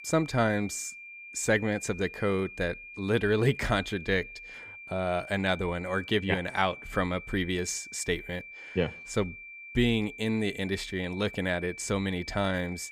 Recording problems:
high-pitched whine; noticeable; throughout; 2.5 kHz, 15 dB below the speech

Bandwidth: 15 kHz